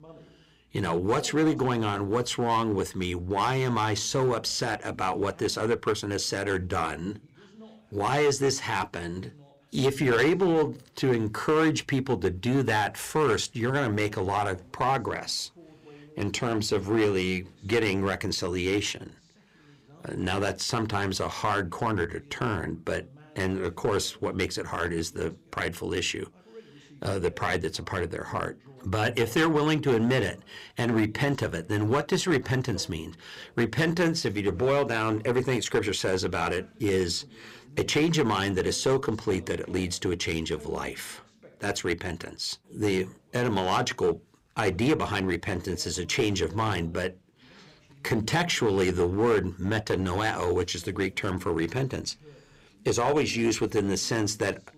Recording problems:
distortion; slight; 5% of the sound clipped
voice in the background; faint; throughout; 25 dB below the speech

